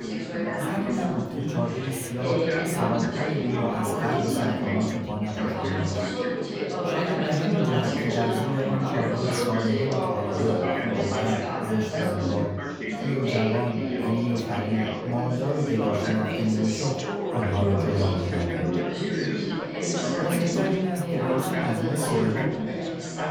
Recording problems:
off-mic speech; far
echo of what is said; faint; from 17 s on; 370 ms later, 20 dB below the speech
room echo; slight; dies away in 0.5 s
chatter from many people; very loud; throughout; 1 dB above the speech

